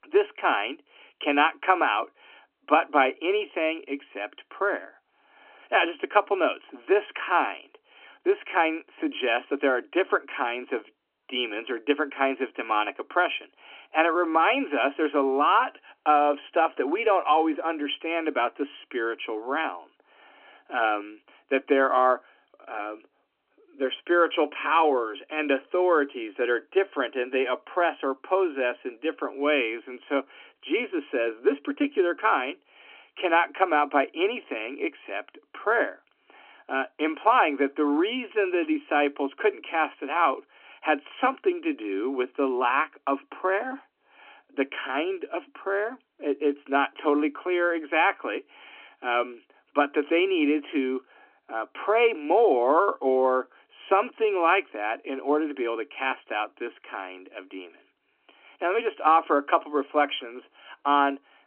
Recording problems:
phone-call audio; nothing above 3 kHz

